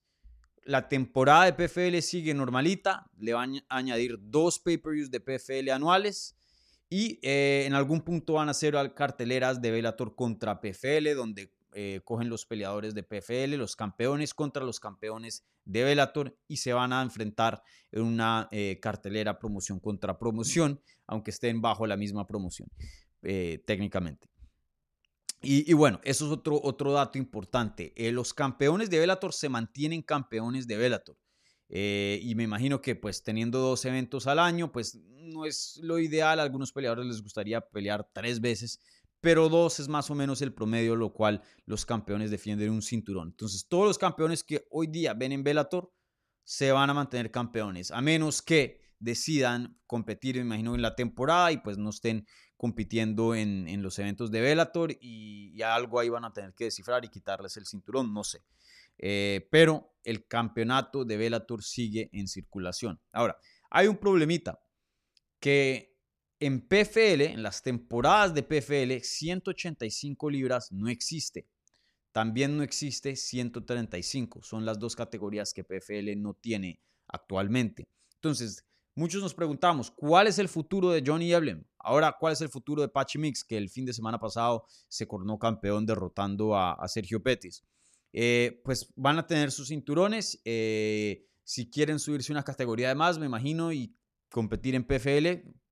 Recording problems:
none

